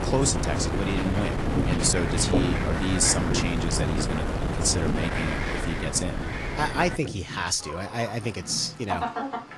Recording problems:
garbled, watery; slightly
wind noise on the microphone; heavy; until 7 s; 3 dB below the speech
animal sounds; loud; throughout; 7 dB below the speech

